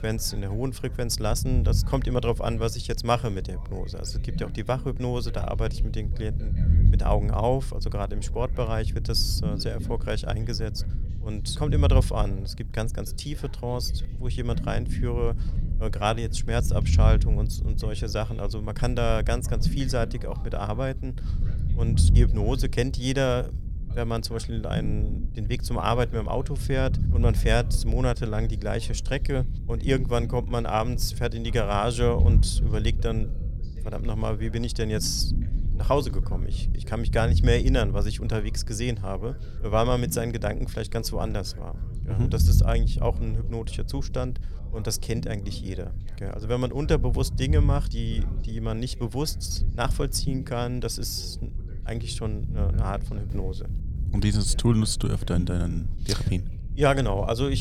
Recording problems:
low rumble; noticeable; throughout; 15 dB below the speech
voice in the background; faint; throughout; 25 dB below the speech
abrupt cut into speech; at the end

